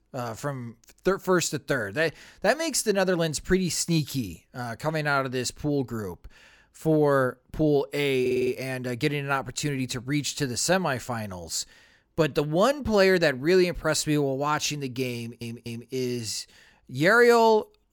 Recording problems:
audio stuttering; at 8 s and at 15 s

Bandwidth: 18 kHz